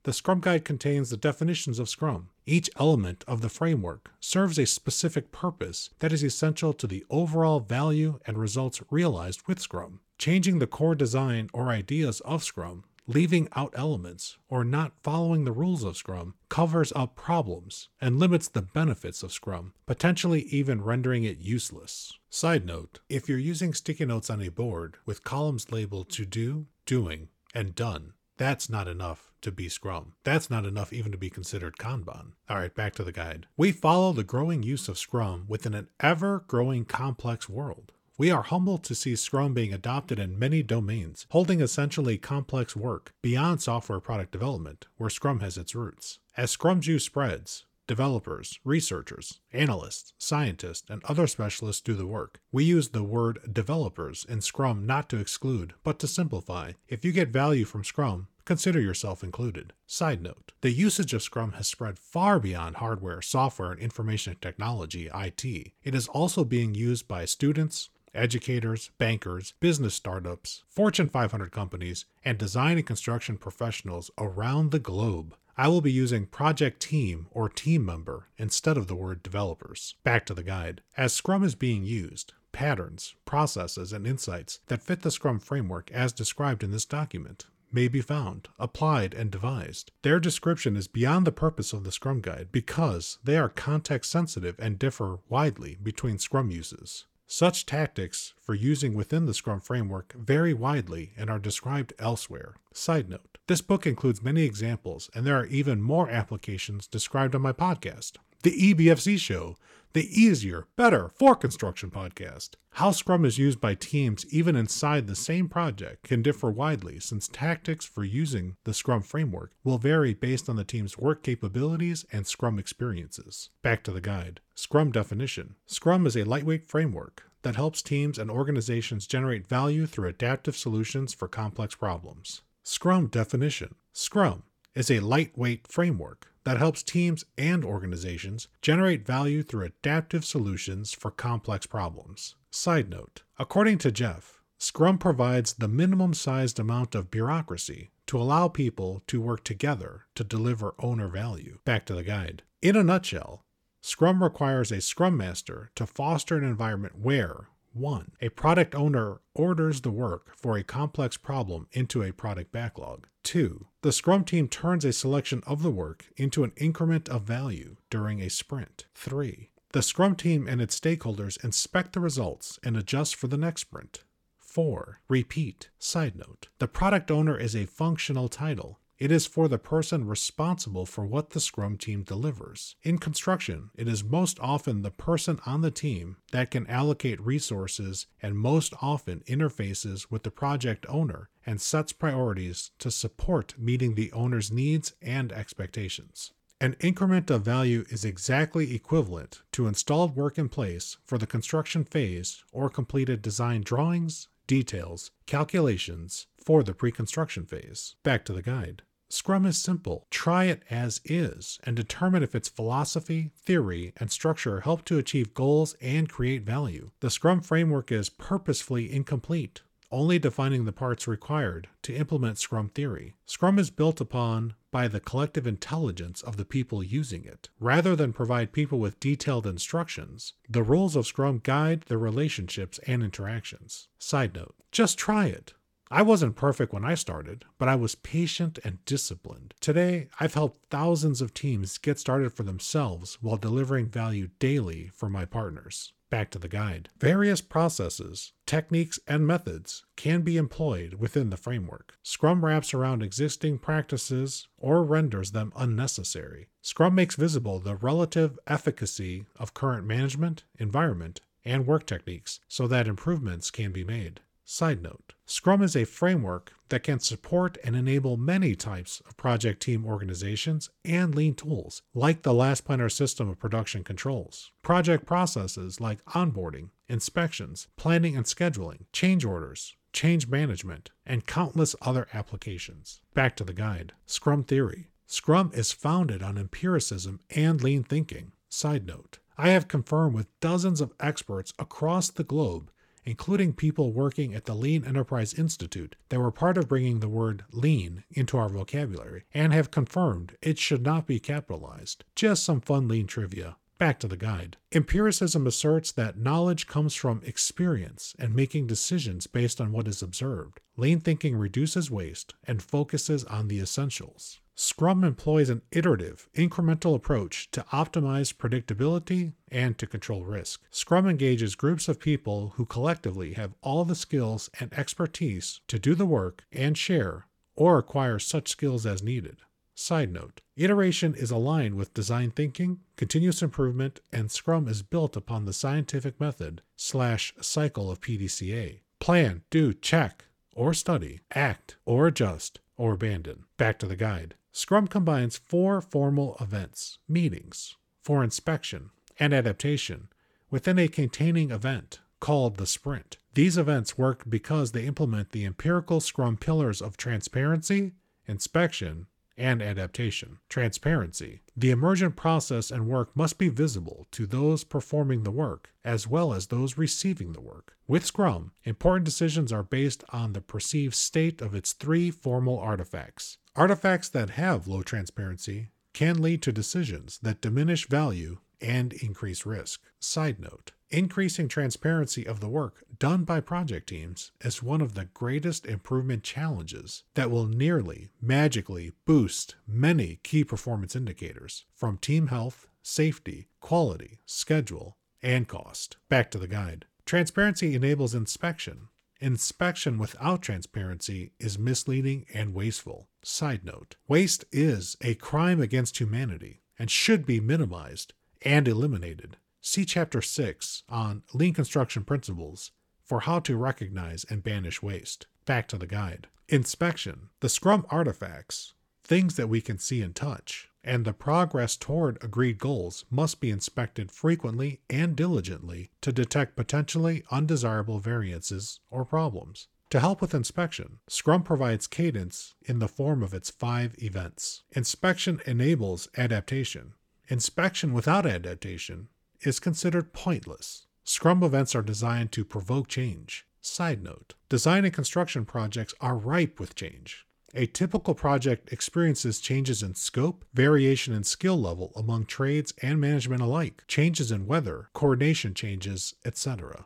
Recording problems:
none

